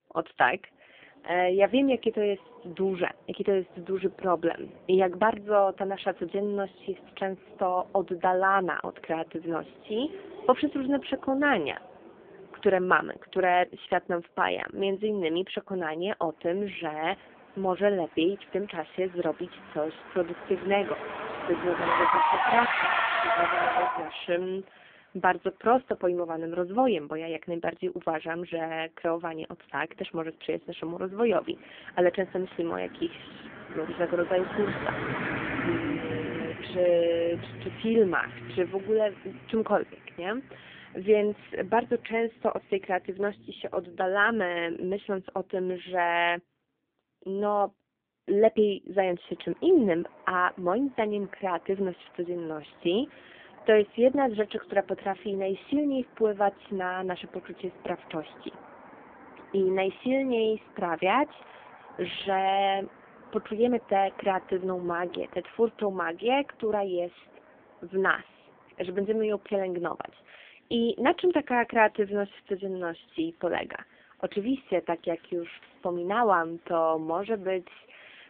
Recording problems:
phone-call audio; poor line
traffic noise; loud; throughout; 3 dB below the speech

